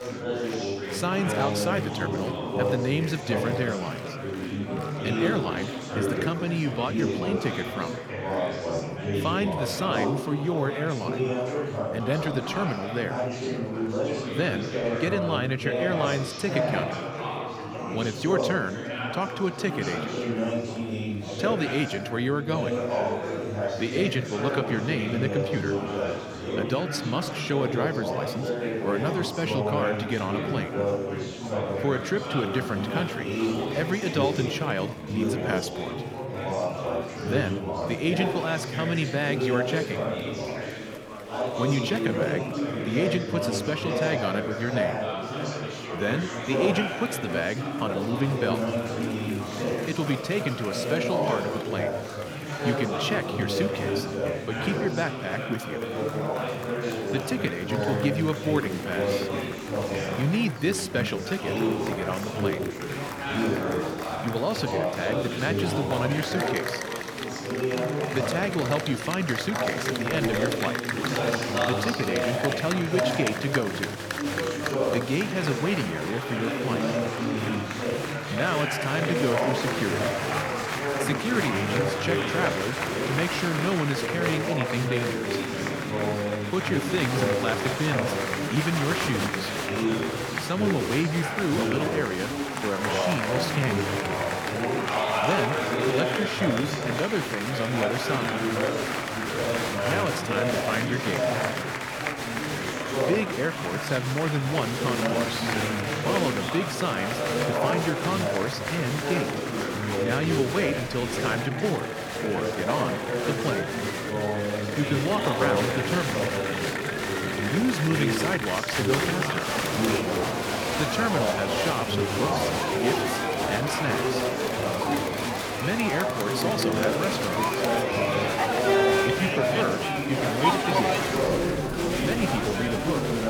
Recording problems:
chatter from many people; very loud; throughout; 1 dB above the speech

